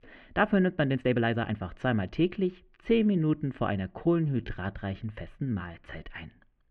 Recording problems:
muffled; very; fading above 2.5 kHz
uneven, jittery; strongly; from 1 to 6 s

